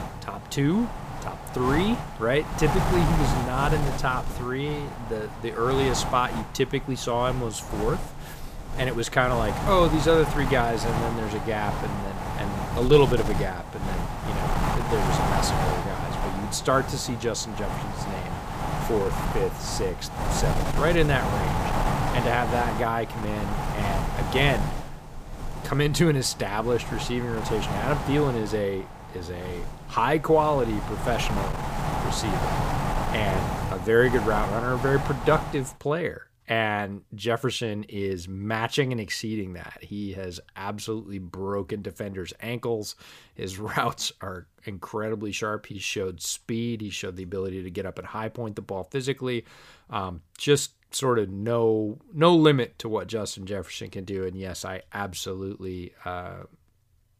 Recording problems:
wind noise on the microphone; heavy; until 36 s; 4 dB below the speech

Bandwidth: 15 kHz